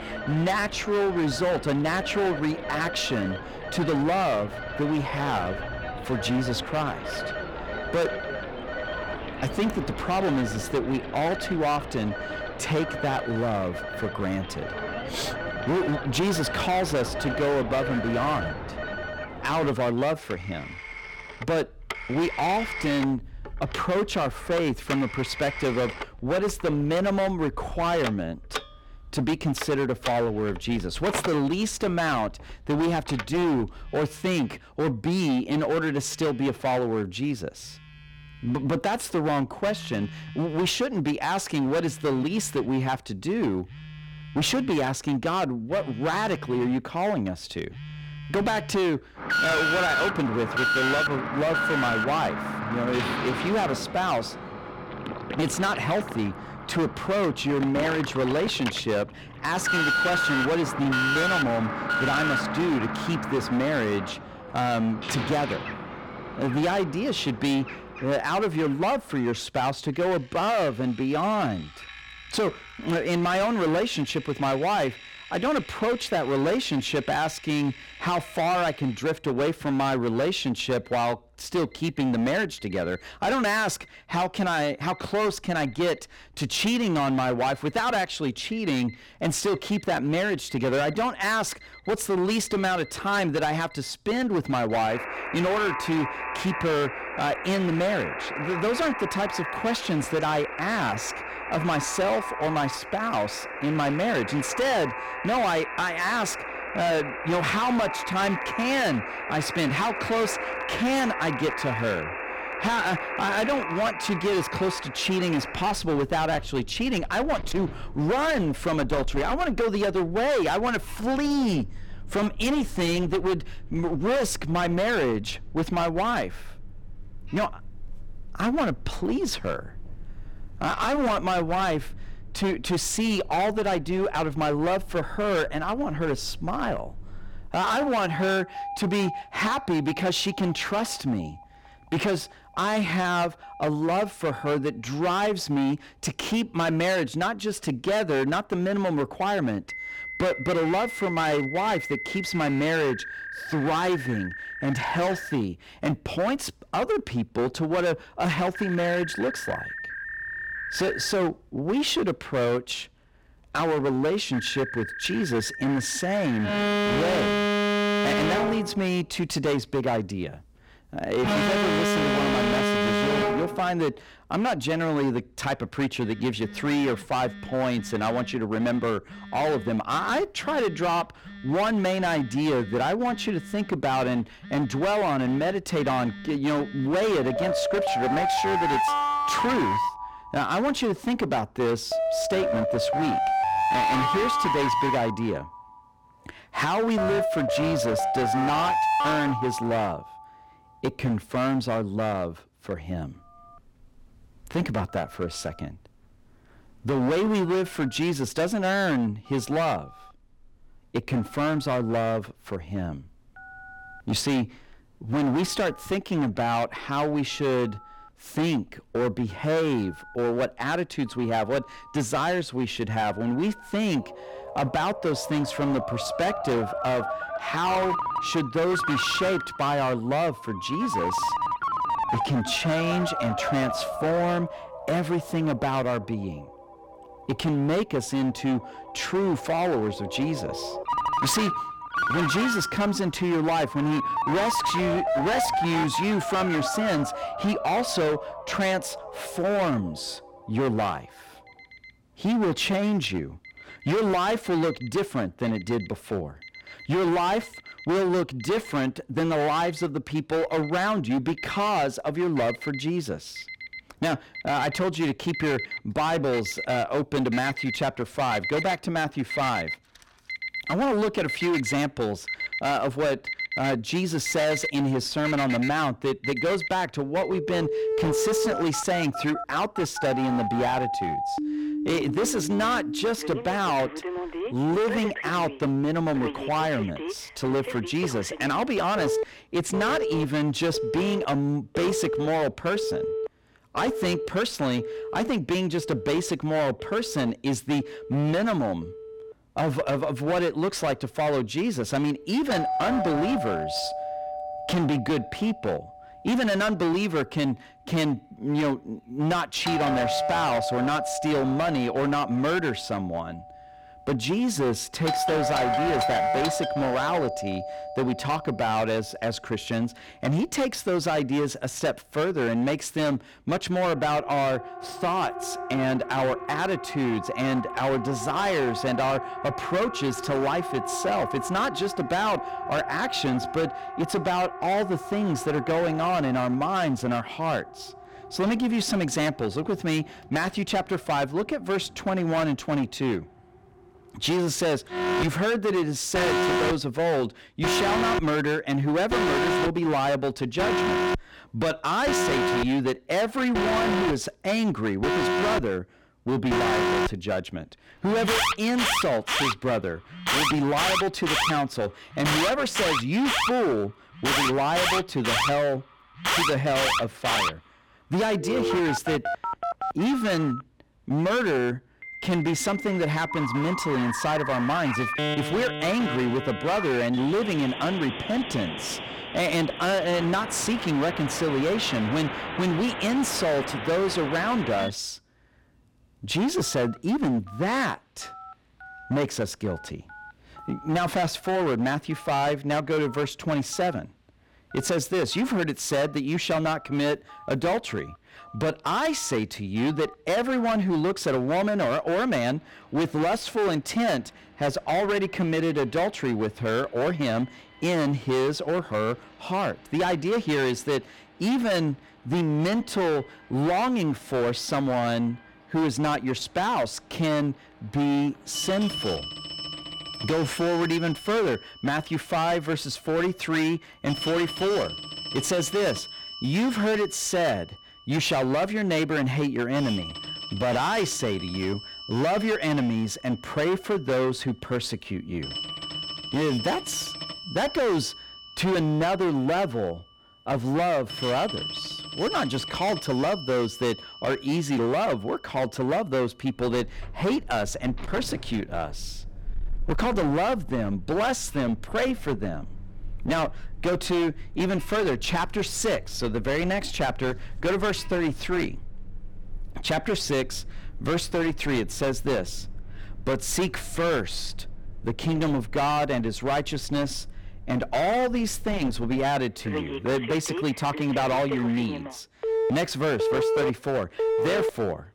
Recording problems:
distortion; heavy; 19% of the sound clipped
alarms or sirens; loud; throughout; 4 dB below the speech

